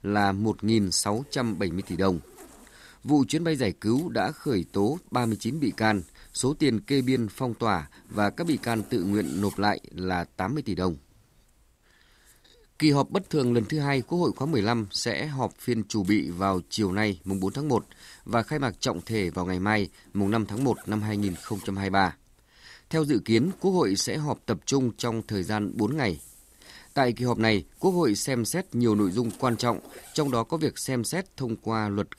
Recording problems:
household noises; faint; throughout; 25 dB below the speech

